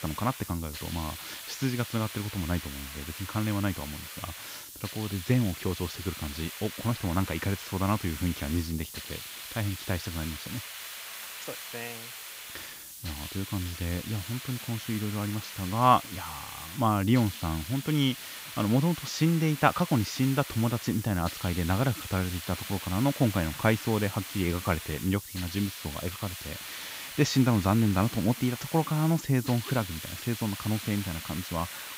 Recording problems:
high frequencies cut off; noticeable; nothing above 7.5 kHz
hiss; loud; throughout; 9 dB below the speech

